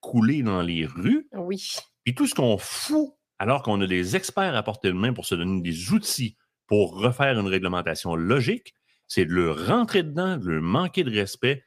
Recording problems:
none

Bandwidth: 15 kHz